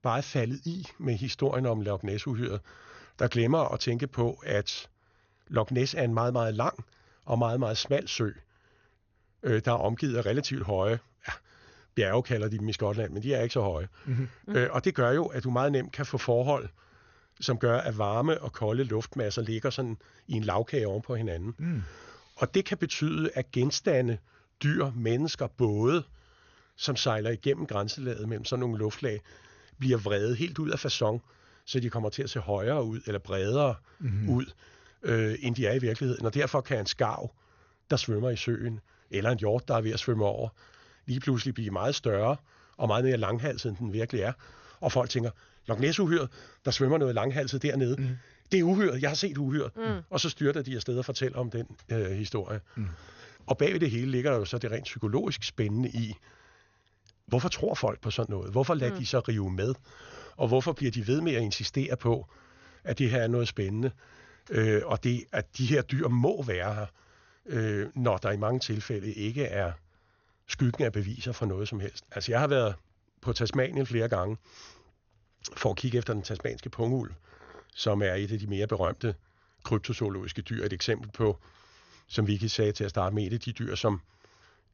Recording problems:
high frequencies cut off; noticeable; nothing above 6.5 kHz

